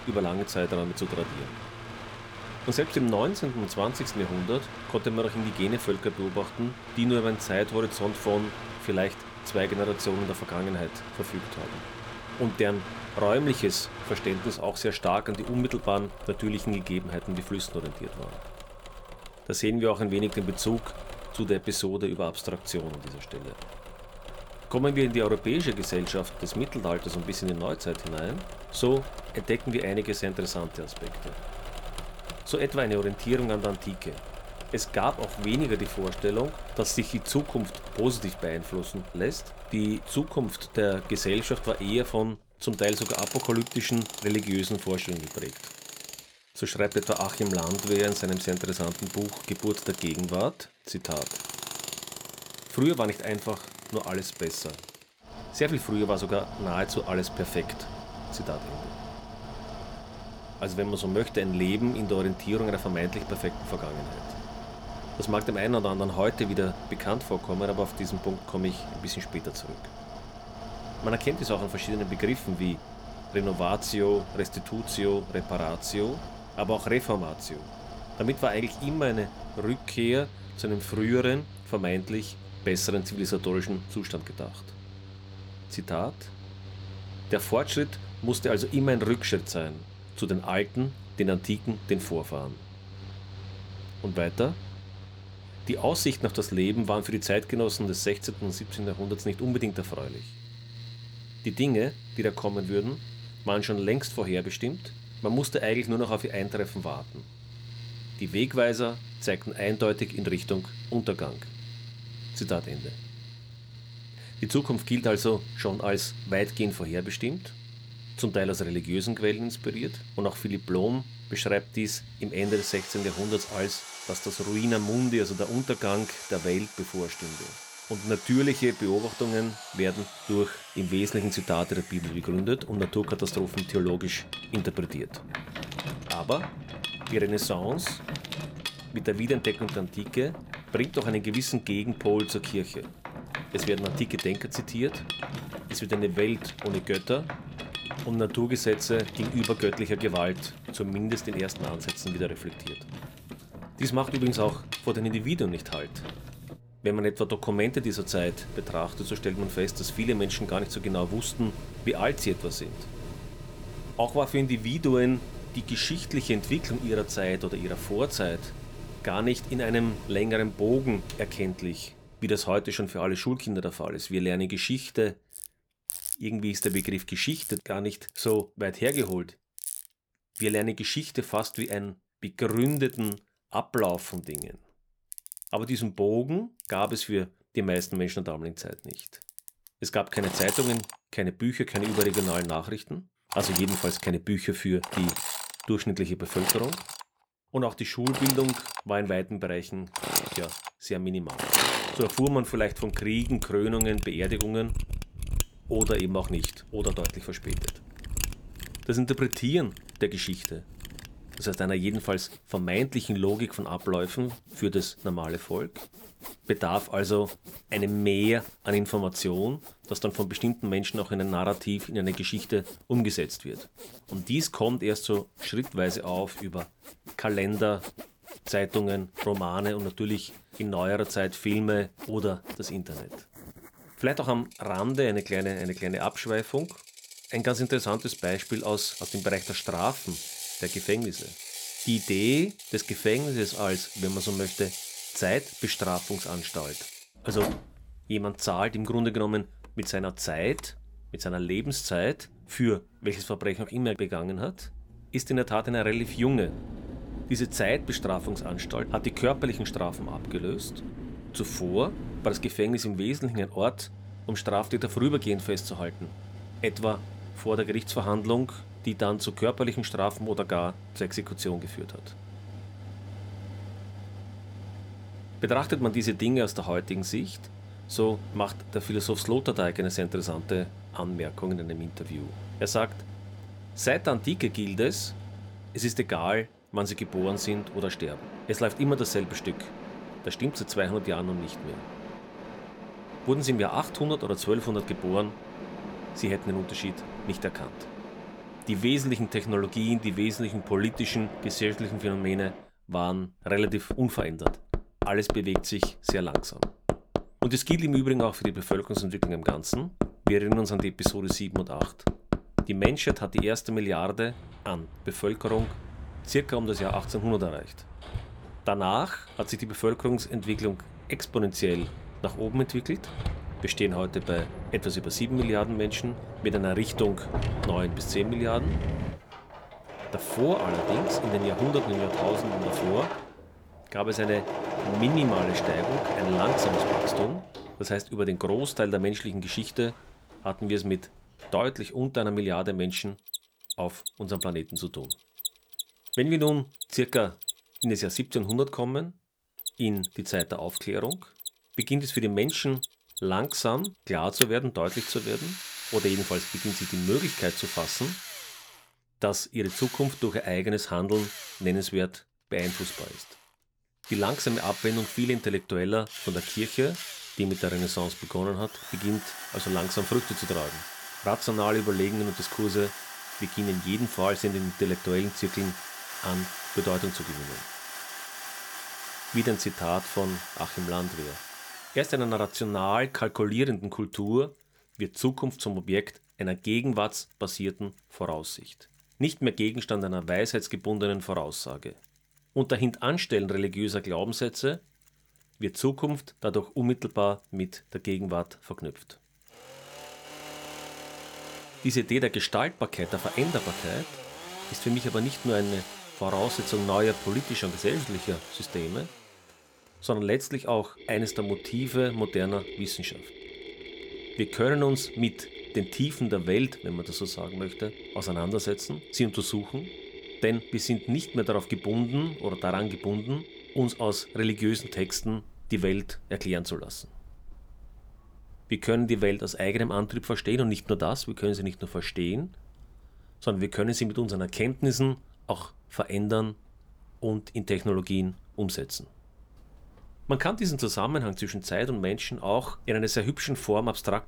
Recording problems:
machinery noise; loud; throughout; 8 dB below the speech

